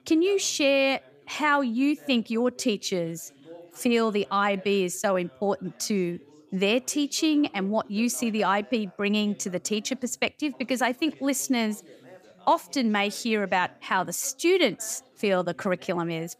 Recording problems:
background chatter; faint; throughout; 3 voices, 25 dB below the speech

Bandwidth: 15 kHz